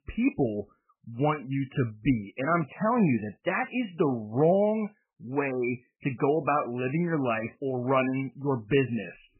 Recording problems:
garbled, watery; badly; nothing above 3 kHz

